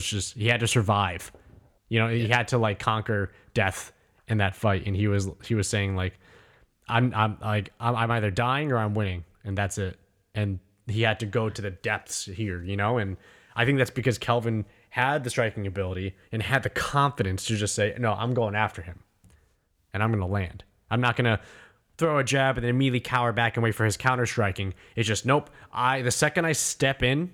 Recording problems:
abrupt cut into speech; at the start

